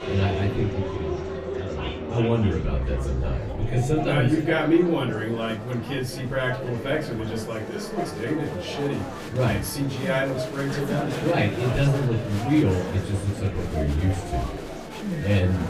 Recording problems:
off-mic speech; far
room echo; slight; dies away in 0.4 s
murmuring crowd; loud; throughout; 8 dB below the speech
background music; noticeable; throughout; 15 dB below the speech

